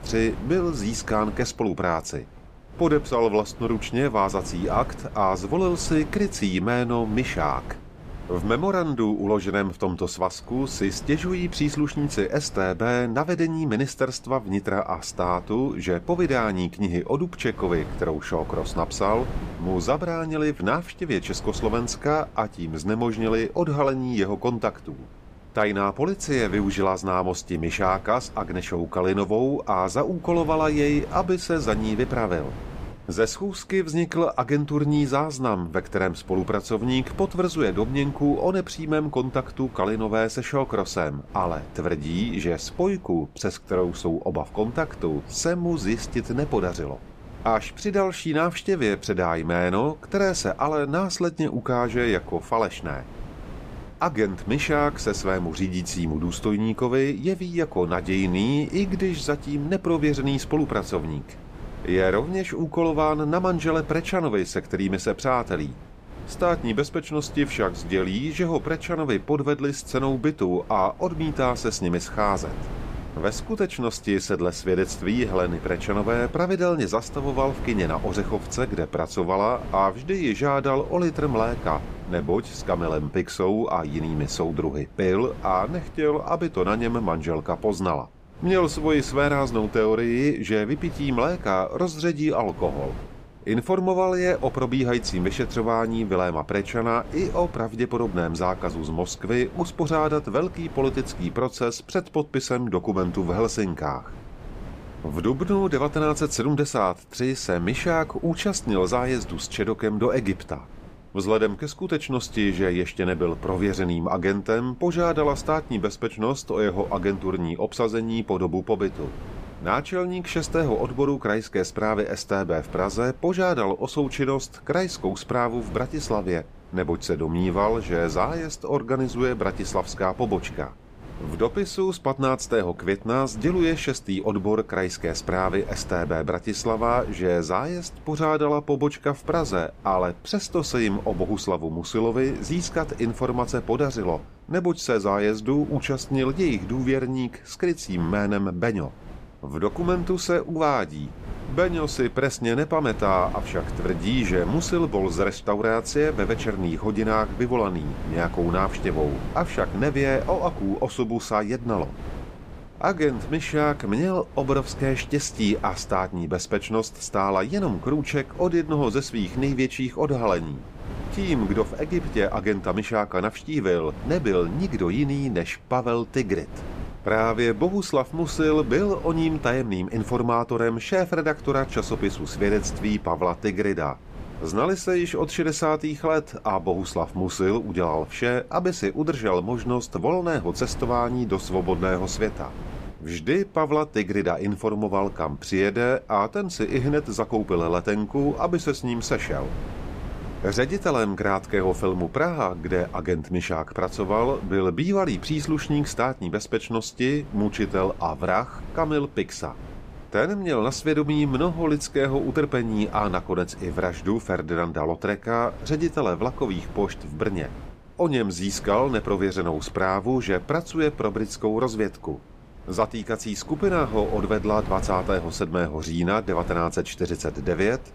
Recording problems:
wind noise on the microphone; occasional gusts; 20 dB below the speech

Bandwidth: 15 kHz